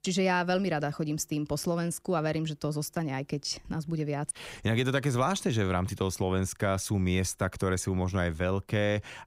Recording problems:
none

